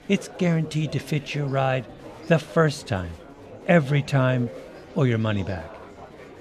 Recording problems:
murmuring crowd; noticeable; throughout; 15 dB below the speech

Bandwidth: 14 kHz